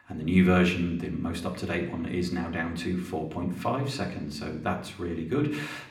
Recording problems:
room echo; slight; dies away in 0.8 s
off-mic speech; somewhat distant

